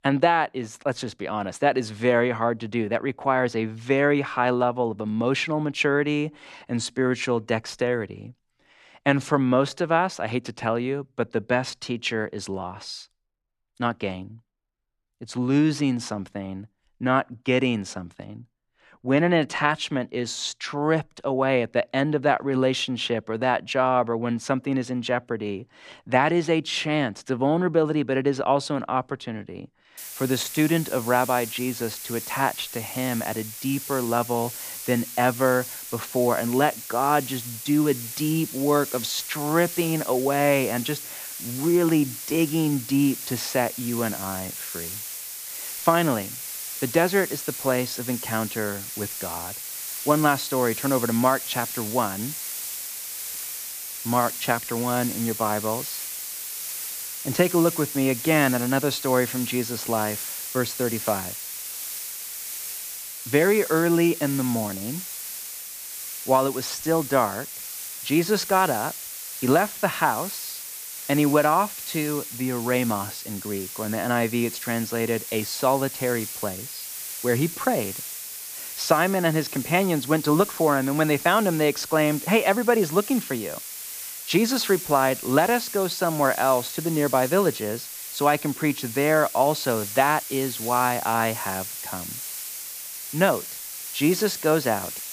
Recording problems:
hiss; loud; from 30 s on; 8 dB below the speech

